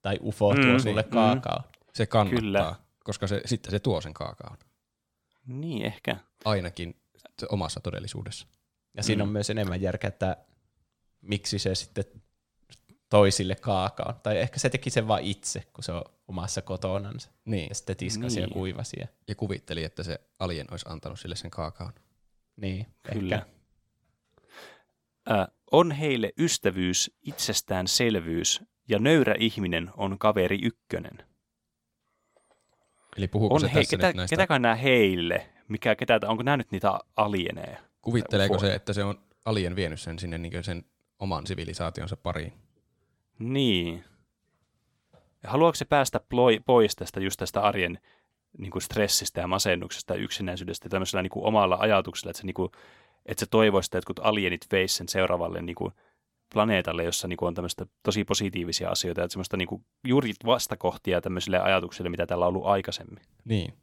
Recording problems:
none

